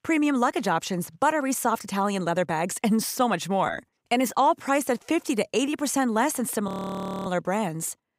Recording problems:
audio freezing; at 6.5 s for 0.5 s

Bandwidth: 15.5 kHz